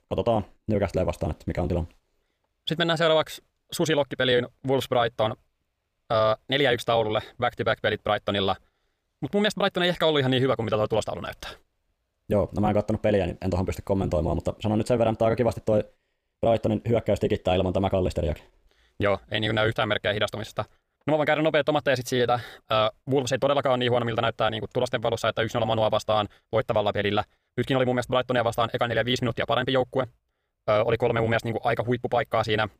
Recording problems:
wrong speed, natural pitch; too fast; 1.5 times normal speed

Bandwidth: 15 kHz